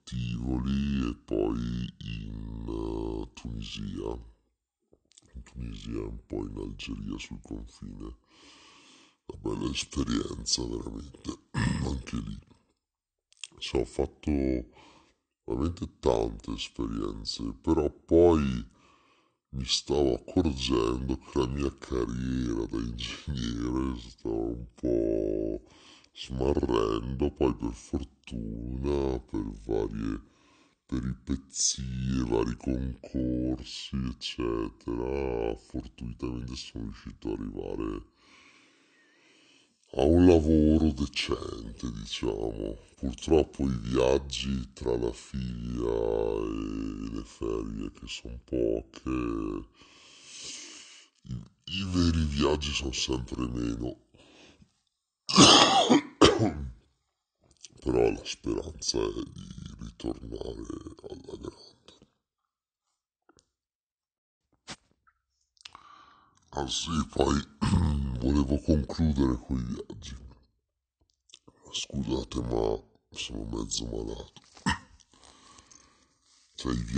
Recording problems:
wrong speed and pitch; too slow and too low; 0.6 times normal speed
abrupt cut into speech; at the end

